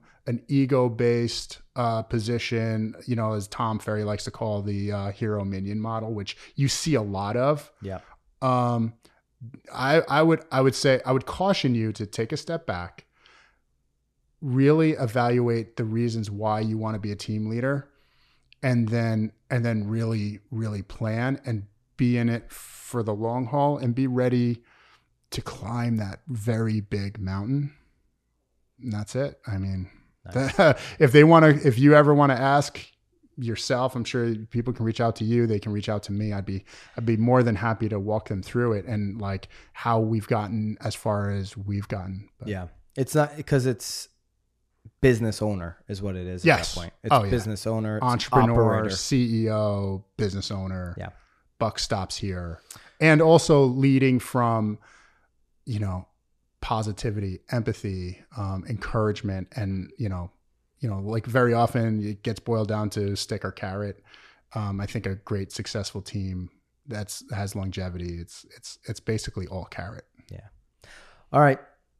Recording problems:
none

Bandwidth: 14 kHz